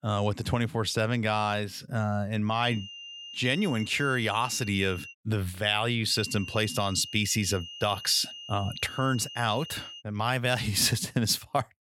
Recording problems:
high-pitched whine; noticeable; from 2.5 to 5 s and from 6 to 10 s; 3 kHz, 15 dB below the speech

